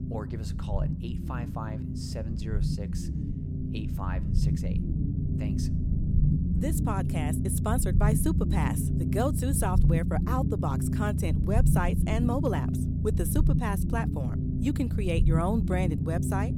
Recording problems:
low rumble; loud; throughout; 4 dB below the speech

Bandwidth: 17.5 kHz